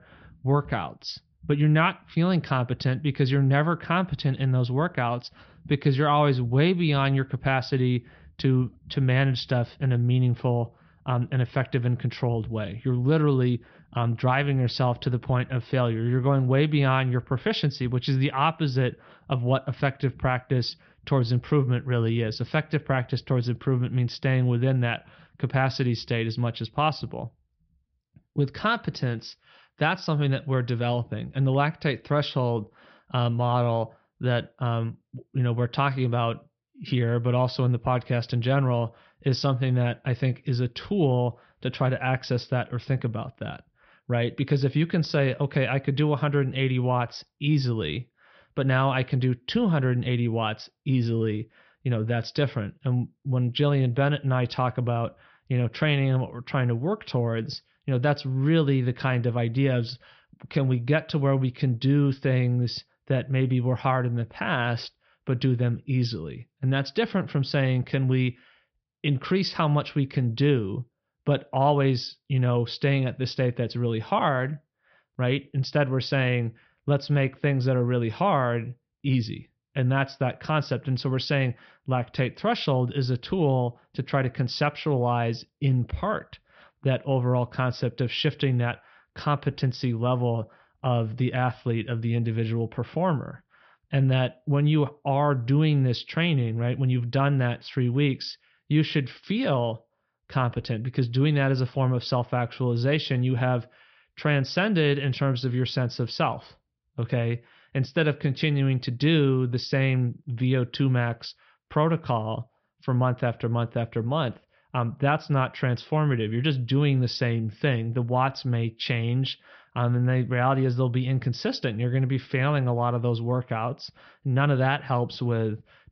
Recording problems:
high frequencies cut off; noticeable; nothing above 5.5 kHz

